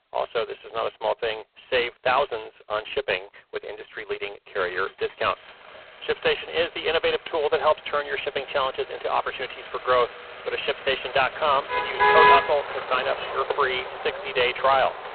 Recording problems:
phone-call audio; poor line
traffic noise; very loud; throughout; 1 dB above the speech

